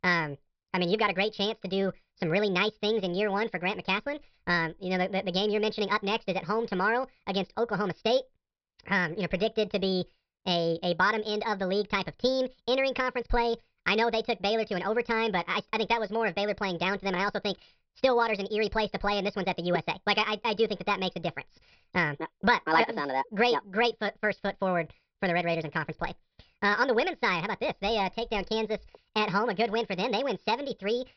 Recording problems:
wrong speed and pitch; too fast and too high; 1.5 times normal speed
high frequencies cut off; noticeable; nothing above 5.5 kHz

